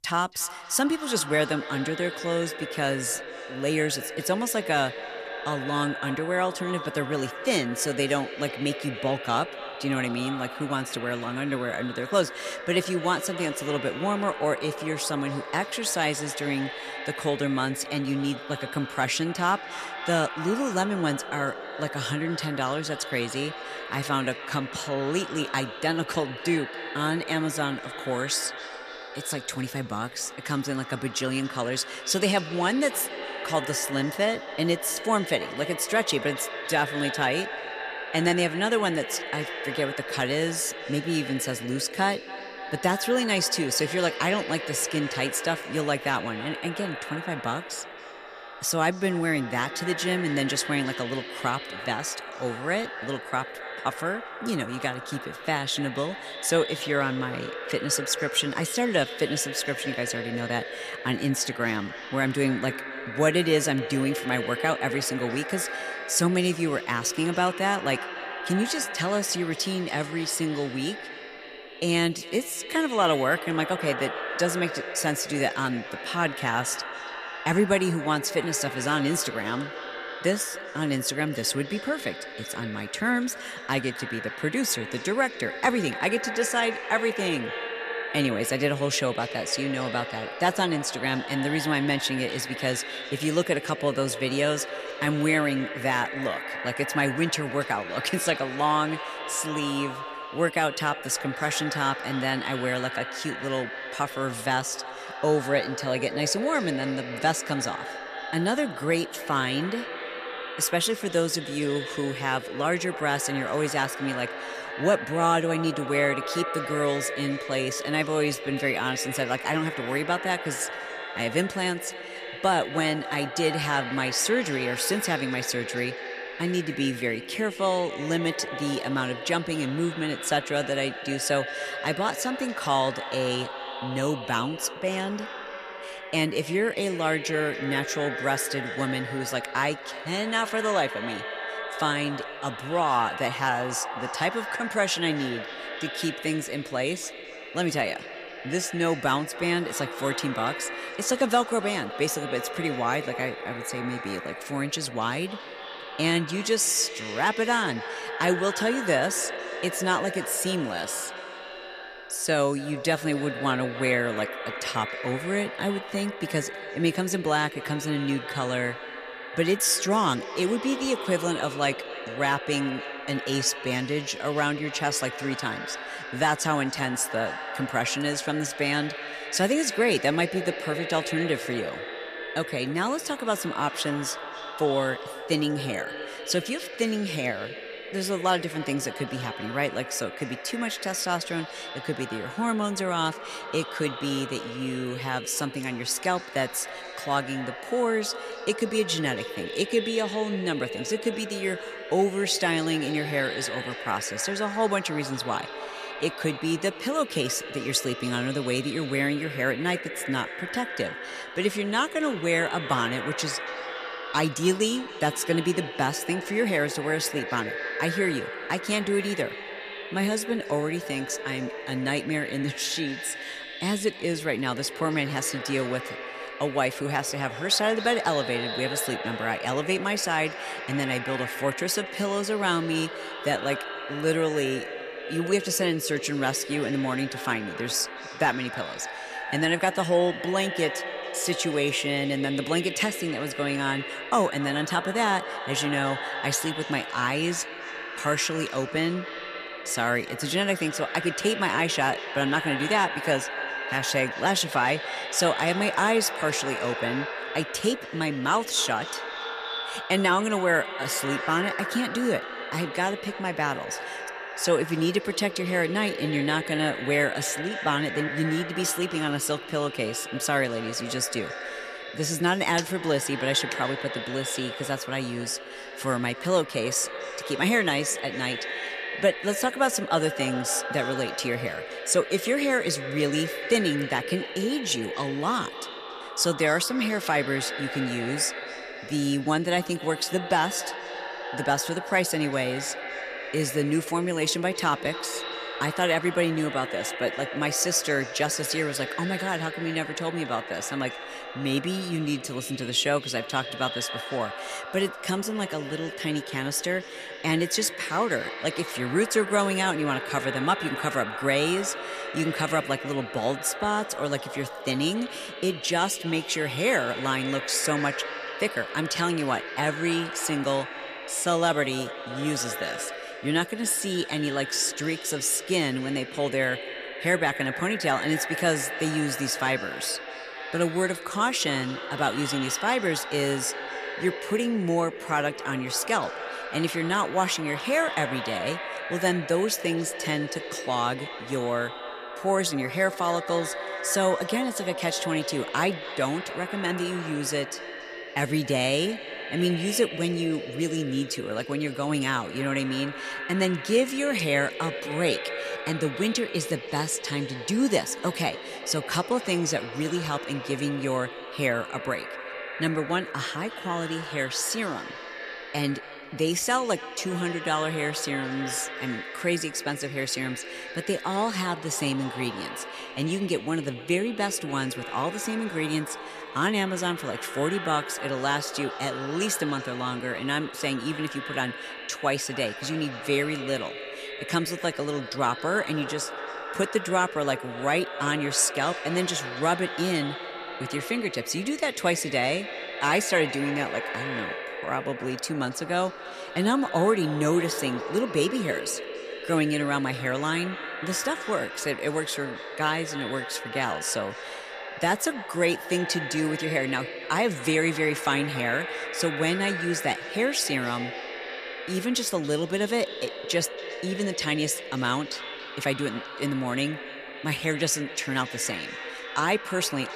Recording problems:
echo of what is said; strong; throughout; 280 ms later, 8 dB below the speech

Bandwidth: 14.5 kHz